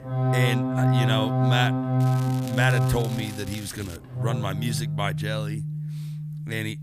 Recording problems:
background music; very loud; throughout; 4 dB above the speech
crackling; noticeable; from 2 to 4 s; 15 dB below the speech

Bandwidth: 14.5 kHz